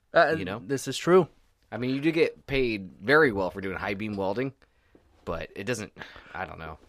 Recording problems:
none

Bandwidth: 15 kHz